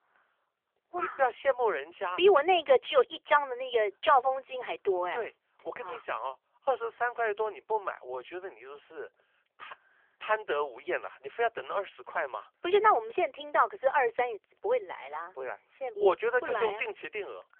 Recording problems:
phone-call audio; nothing above 3.5 kHz

